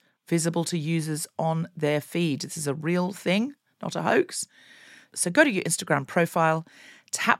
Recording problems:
none

